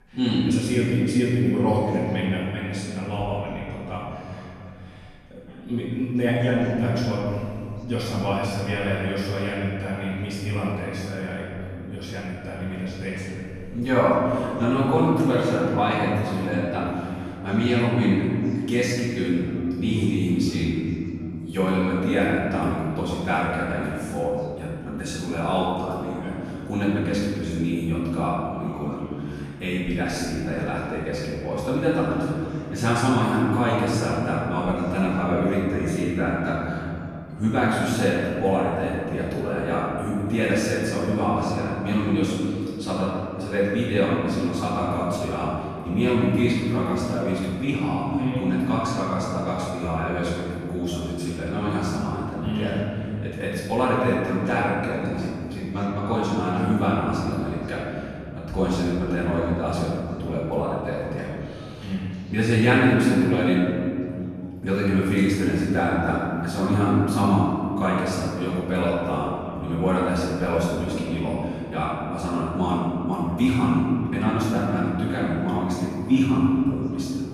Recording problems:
room echo; strong; dies away in 2.9 s
off-mic speech; far
background chatter; faint; throughout; 2 voices, 25 dB below the speech

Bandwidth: 14.5 kHz